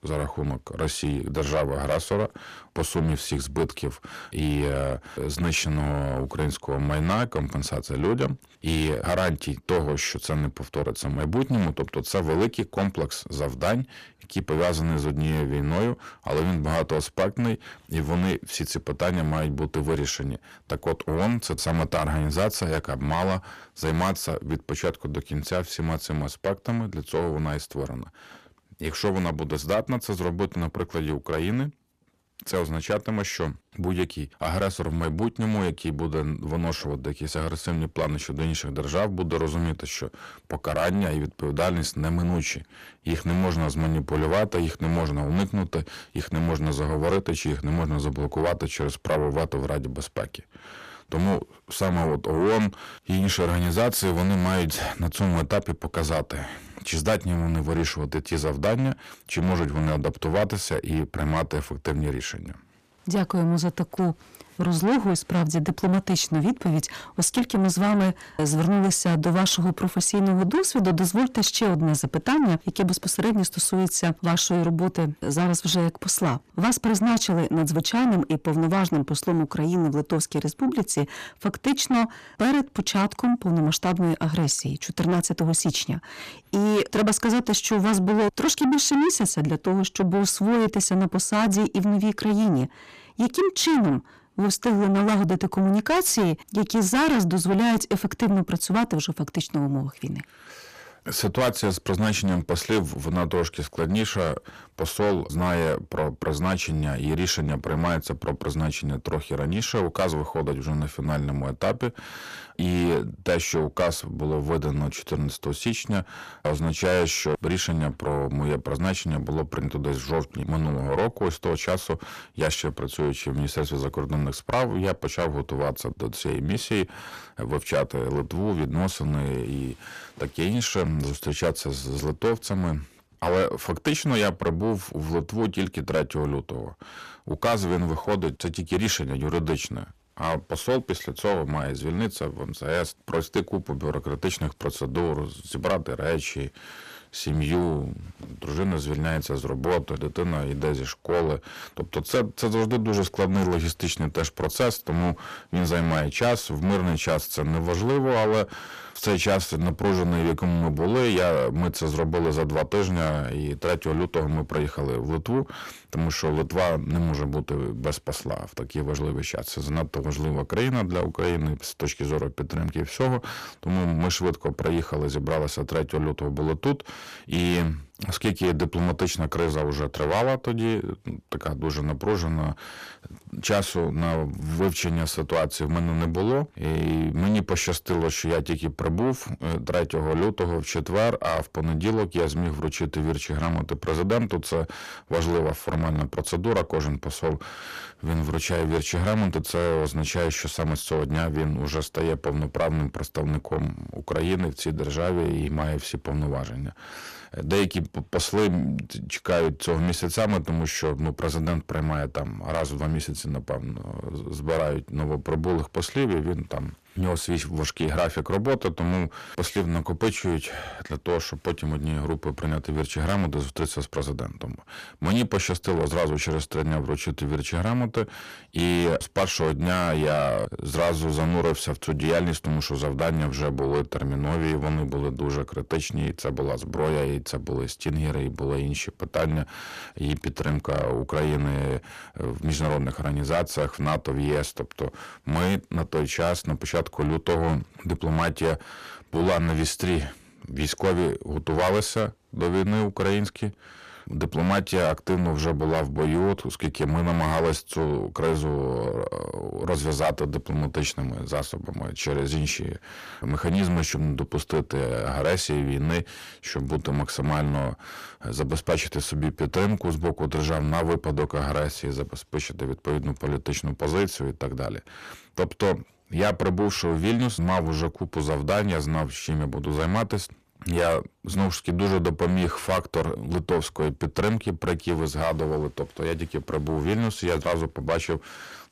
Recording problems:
distortion; heavy; 6 dB below the speech

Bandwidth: 14.5 kHz